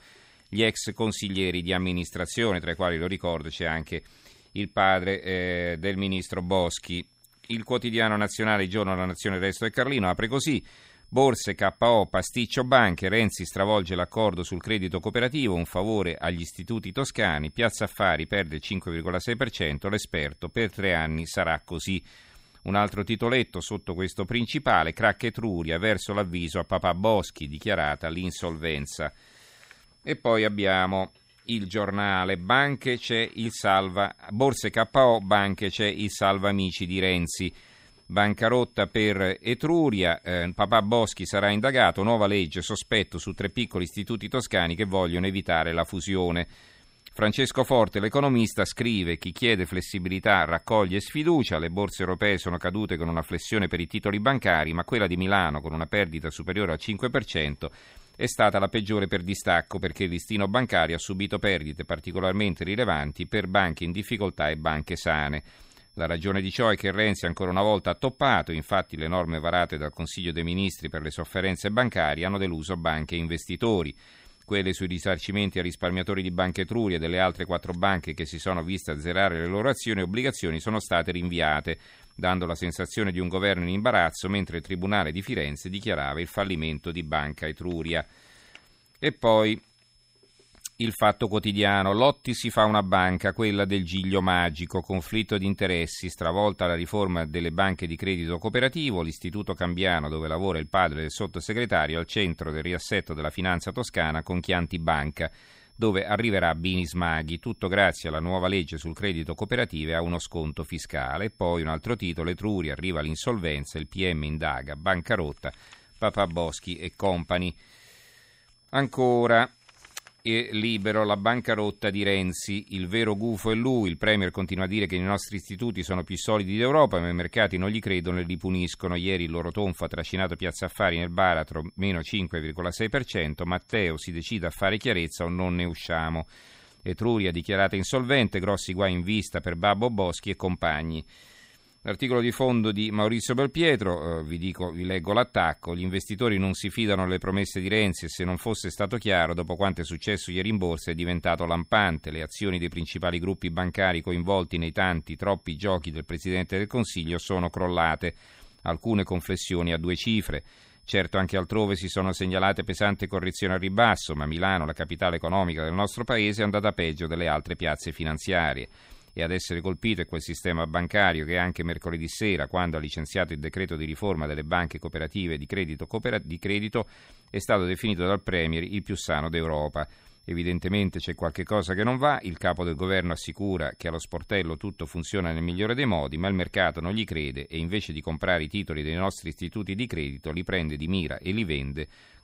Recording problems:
high-pitched whine; faint; throughout; 5 kHz, 35 dB below the speech

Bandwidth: 15.5 kHz